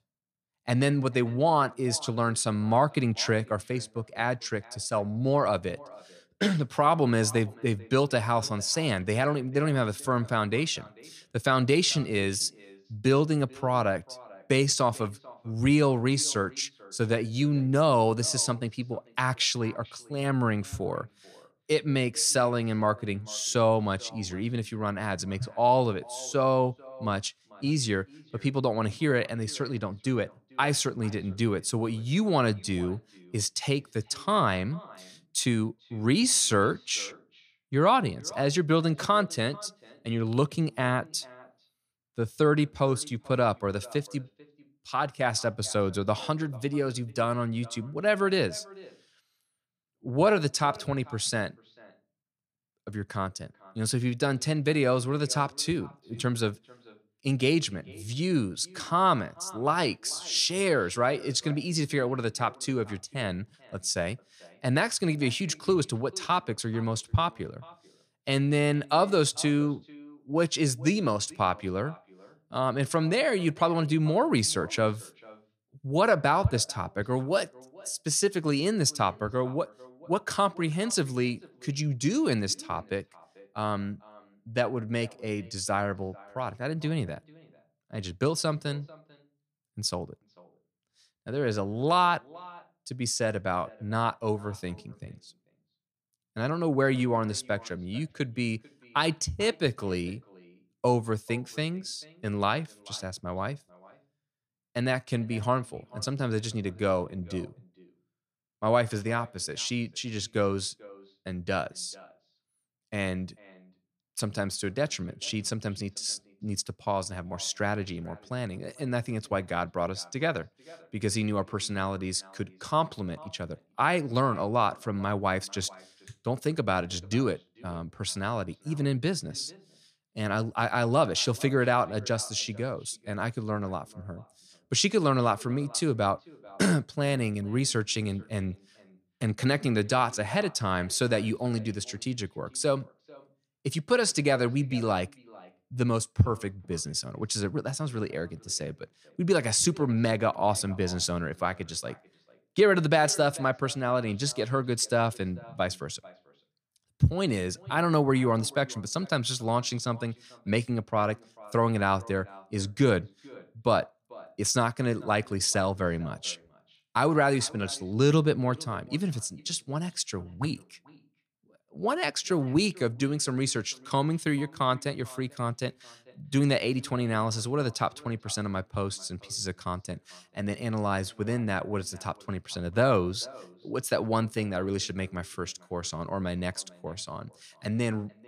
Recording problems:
echo of what is said; faint; throughout; 440 ms later, 25 dB below the speech

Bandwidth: 15 kHz